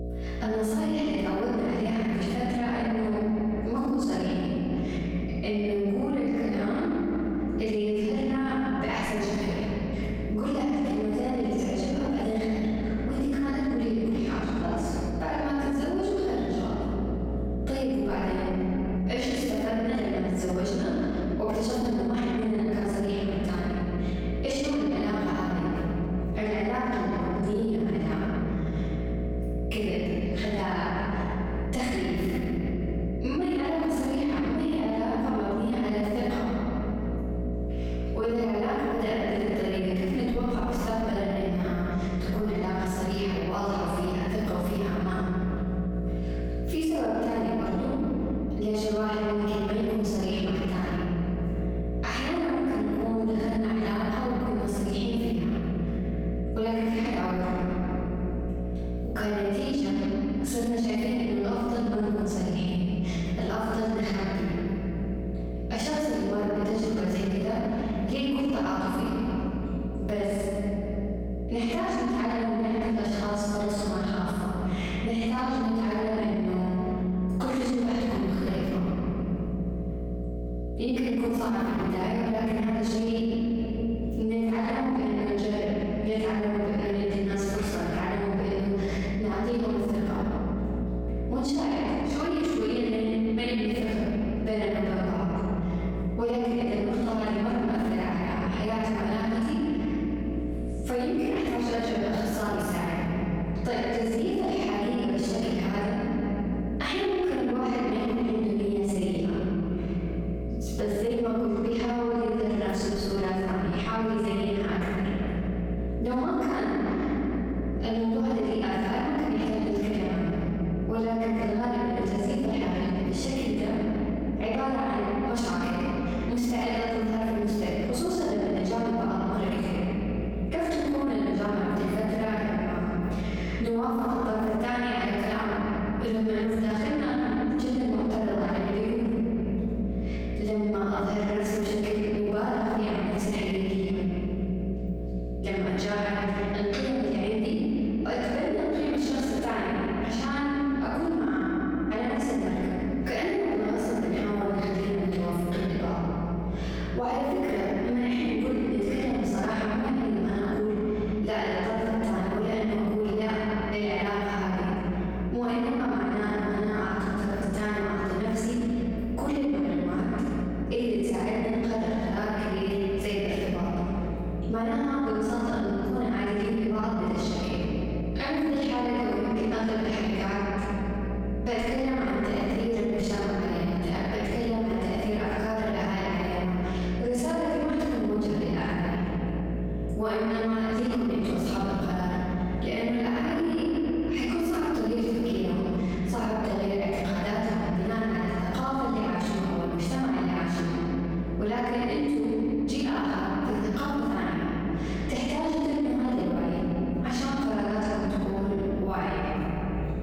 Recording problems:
room echo; strong; dies away in 2.9 s
off-mic speech; far
squashed, flat; somewhat
electrical hum; noticeable; throughout; 60 Hz, 15 dB below the speech

